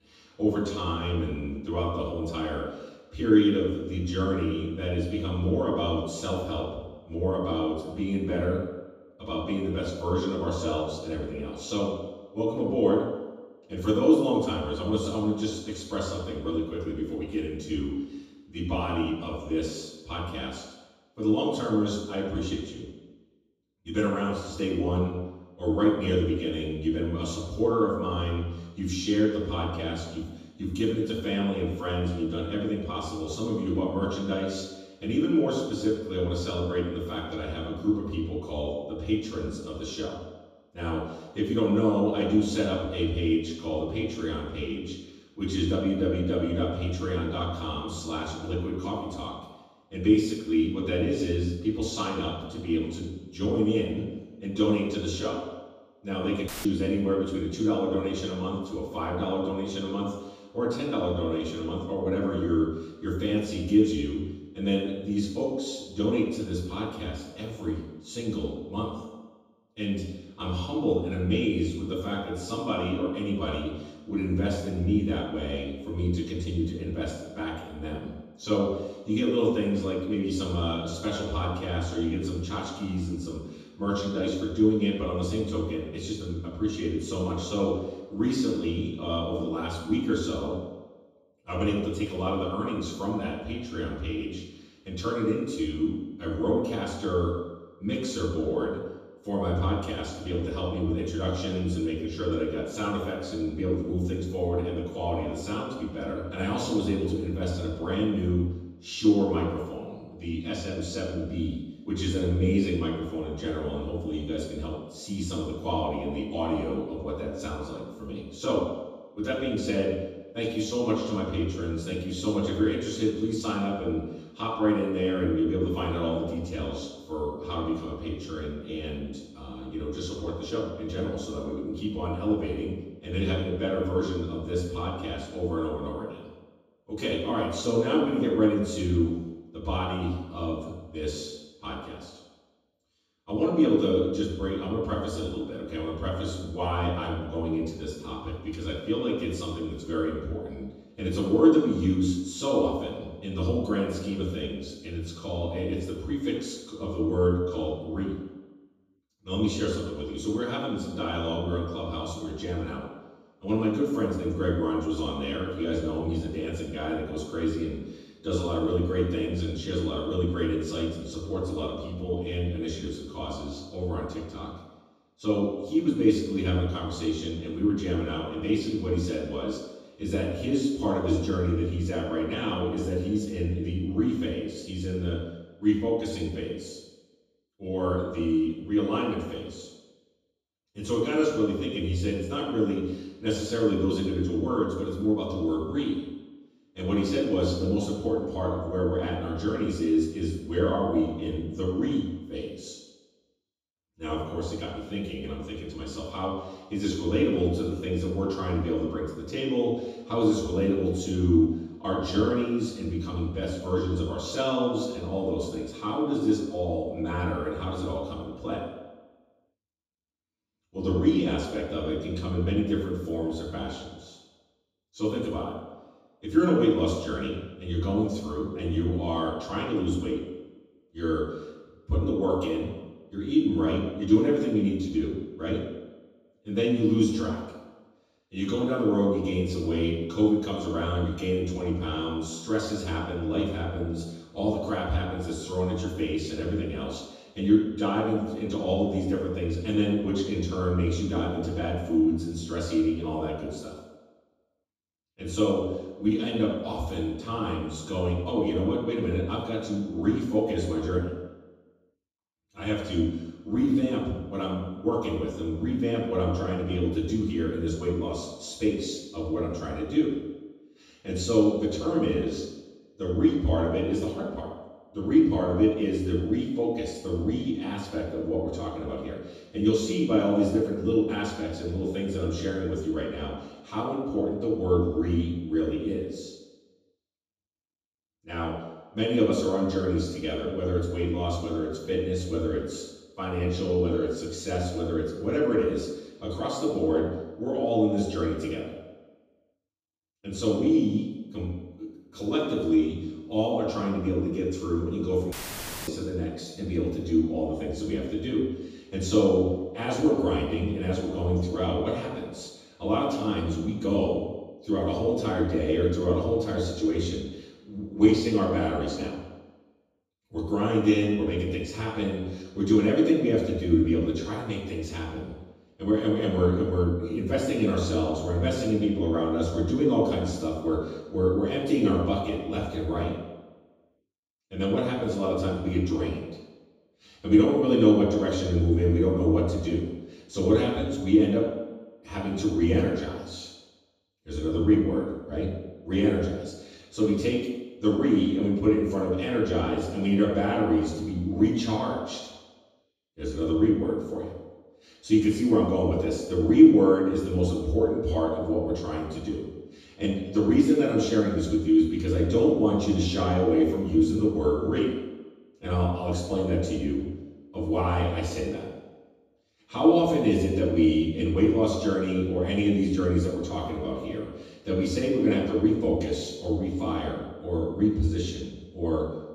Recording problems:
off-mic speech; far
room echo; noticeable; dies away in 1.1 s
audio cutting out; filled with static; at 56 s and at 5:05 for 0.5 s

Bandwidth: 15 kHz